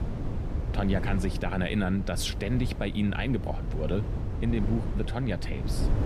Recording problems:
wind noise on the microphone; heavy; 9 dB below the speech

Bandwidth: 14.5 kHz